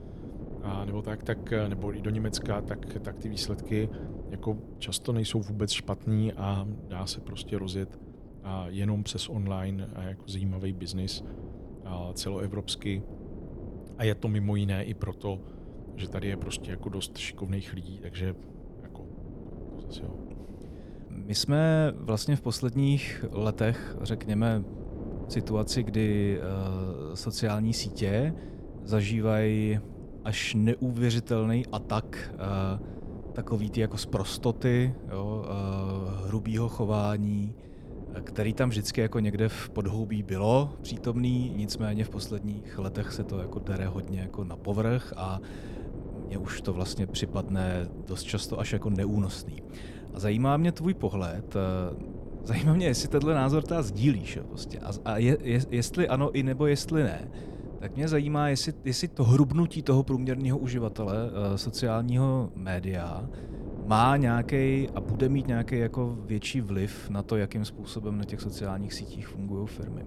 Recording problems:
wind noise on the microphone; occasional gusts; 15 dB below the speech

